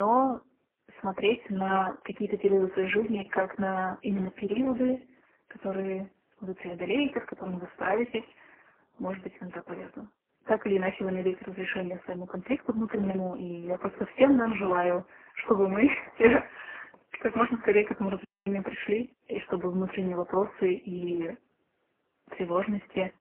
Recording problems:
phone-call audio; poor line; nothing above 3 kHz
garbled, watery; badly
abrupt cut into speech; at the start
audio cutting out; at 18 s

